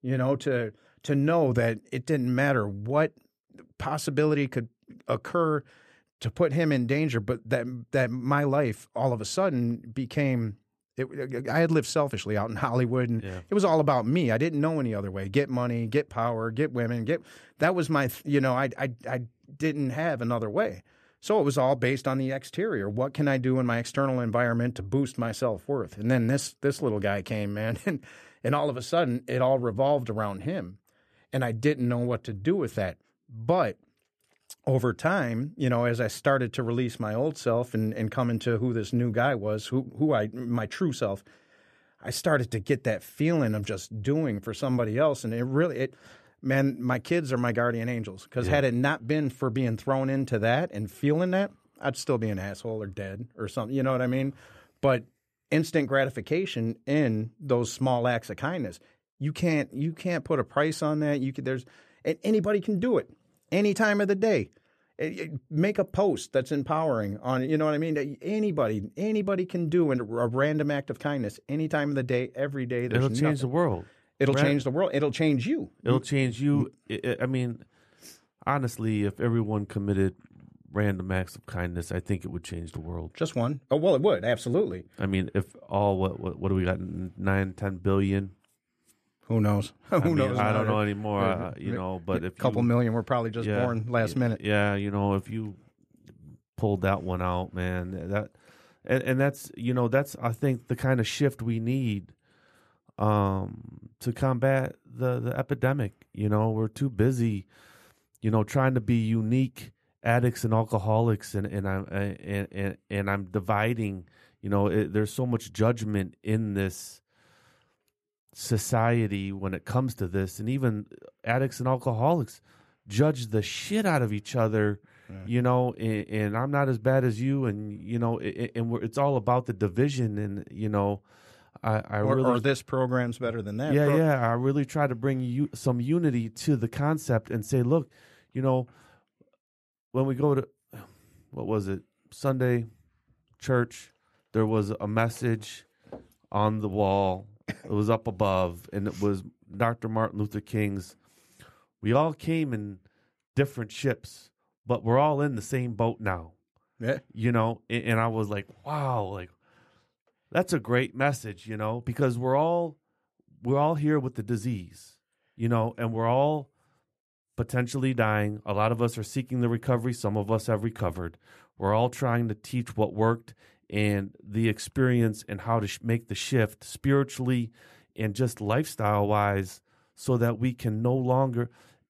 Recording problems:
none

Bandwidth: 14 kHz